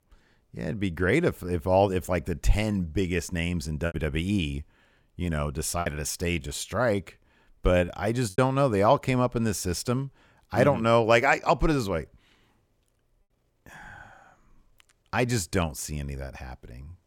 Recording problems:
choppy; very; at 4 s and from 6 to 8.5 s; 7% of the speech affected

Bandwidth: 17.5 kHz